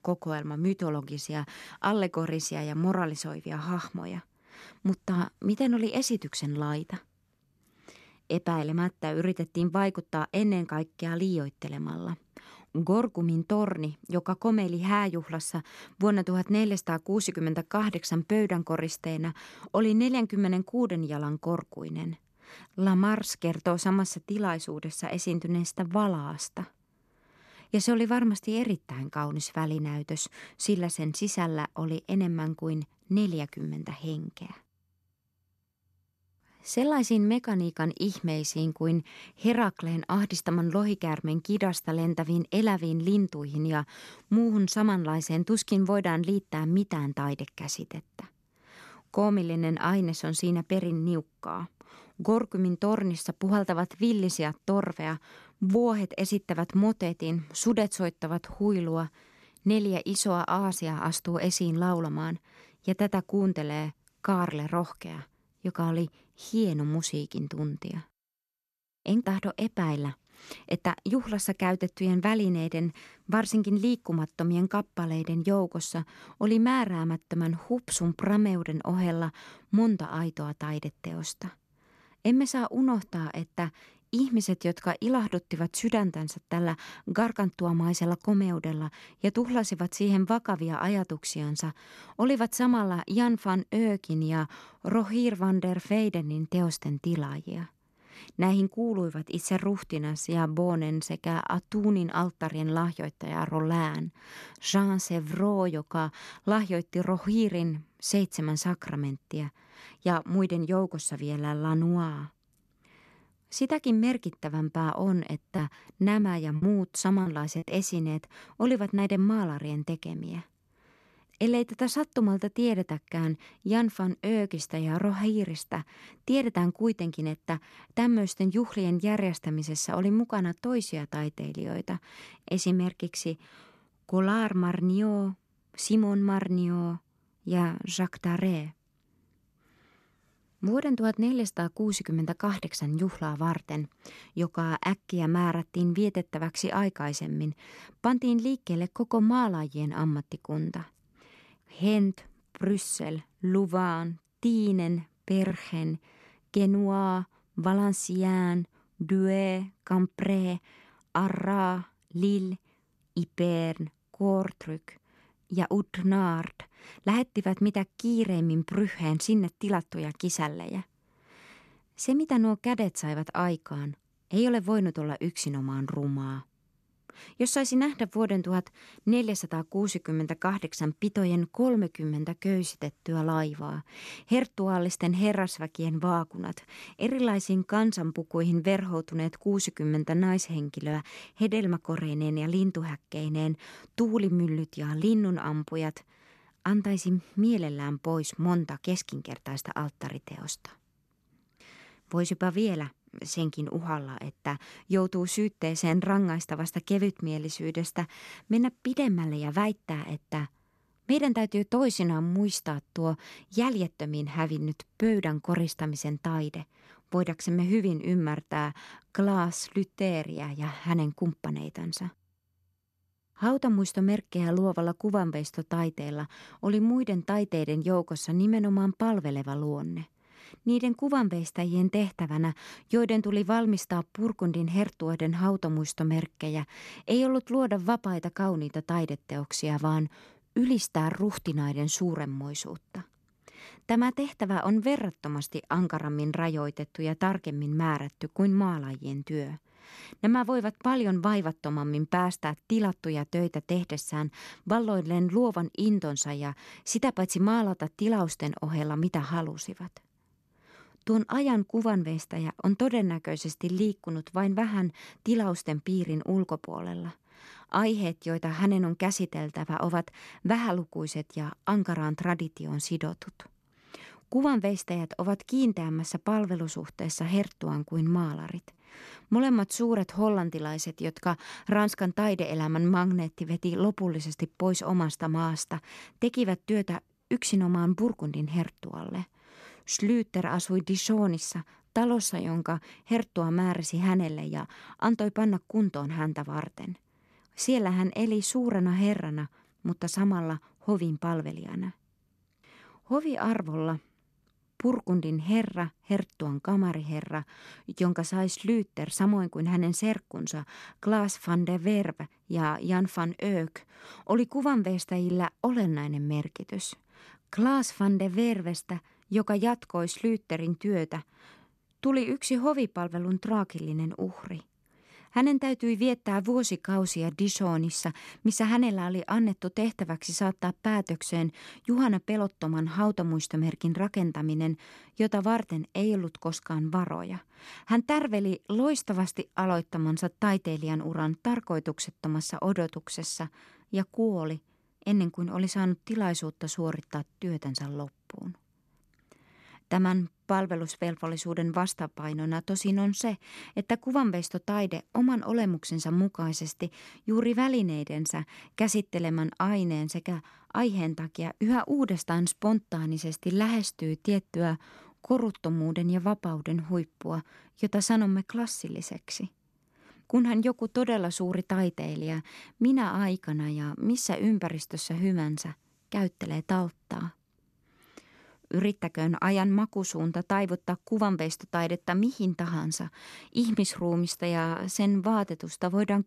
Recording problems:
choppy; occasionally; from 1:56 to 1:59; 4% of the speech affected

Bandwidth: 13.5 kHz